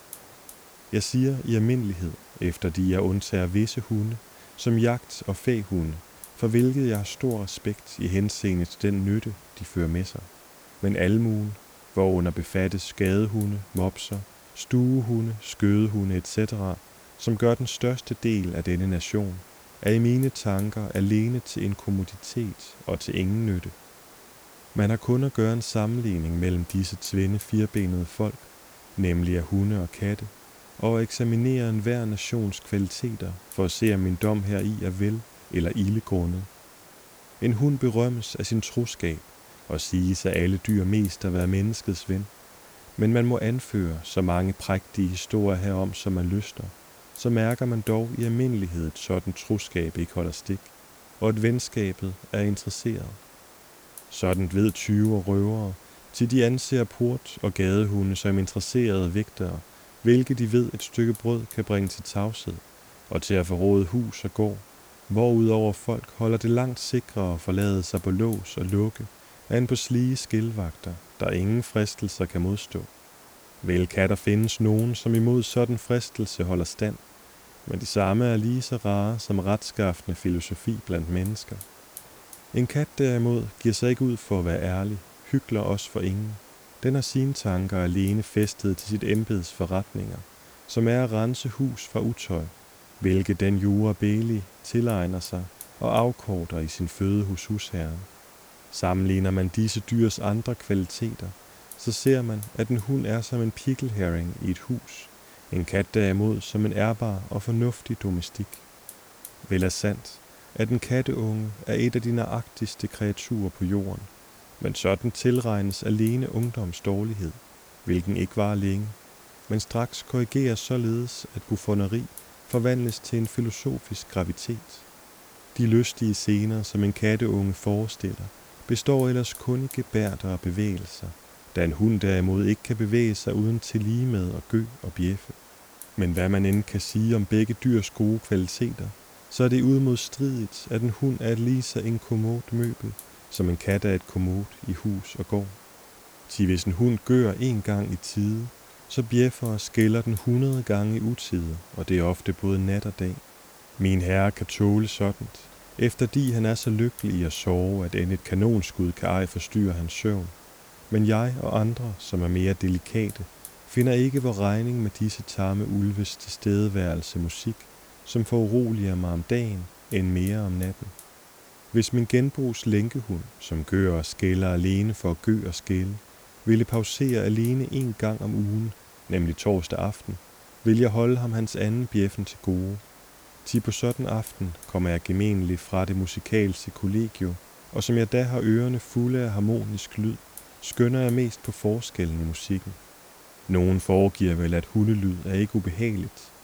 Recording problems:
hiss; faint; throughout; 20 dB below the speech

